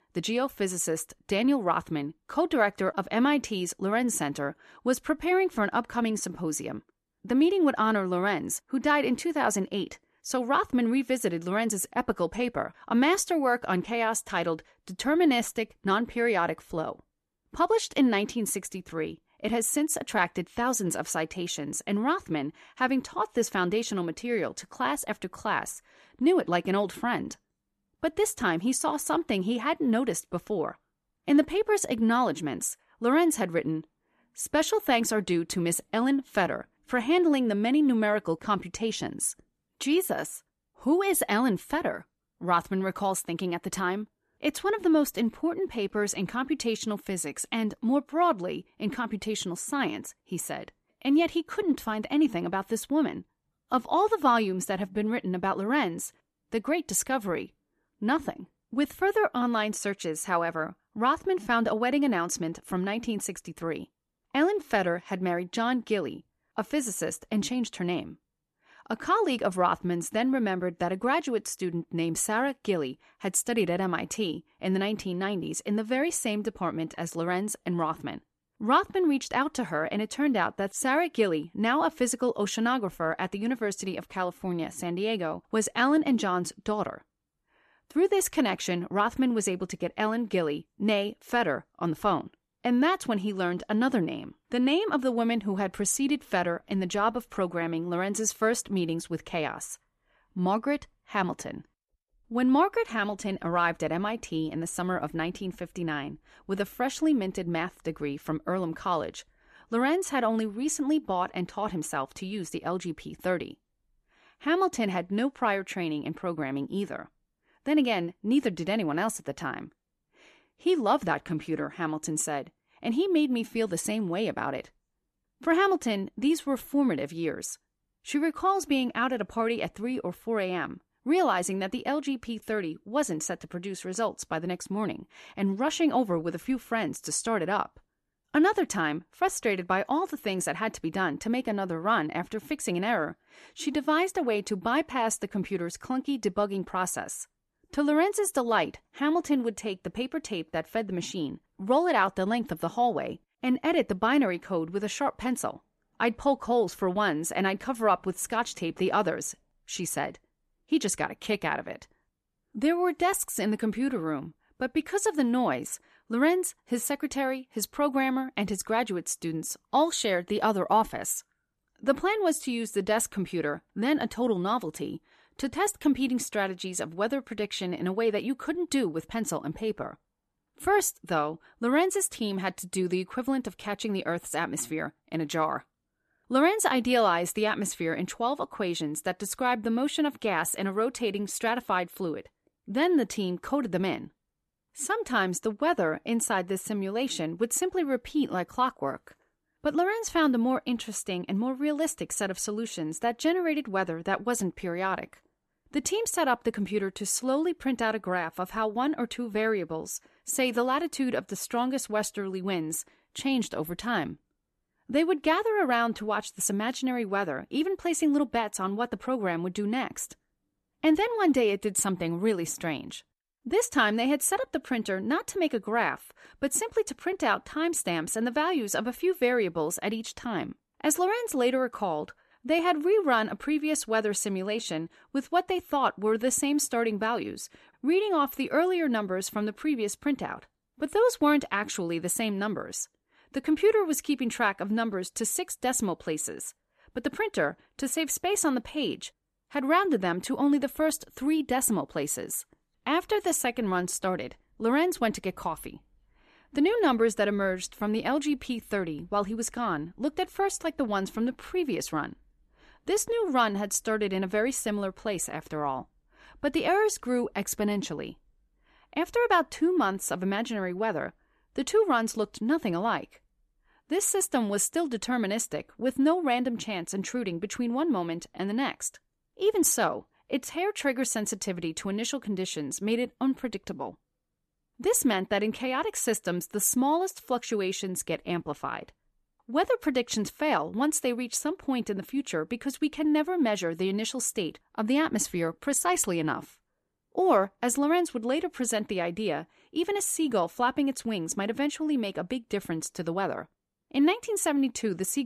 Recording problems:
abrupt cut into speech; at the end

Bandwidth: 13.5 kHz